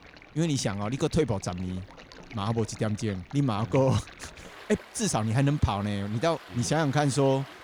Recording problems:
rain or running water; noticeable; throughout; 20 dB below the speech

